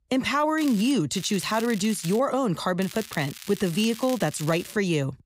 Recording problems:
crackling; noticeable; at 0.5 s, from 1 to 2 s and from 3 to 4.5 s; 15 dB below the speech

